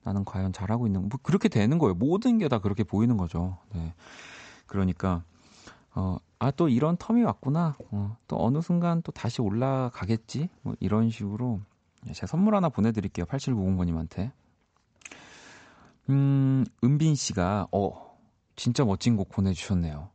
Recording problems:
high frequencies cut off; noticeable; nothing above 8 kHz

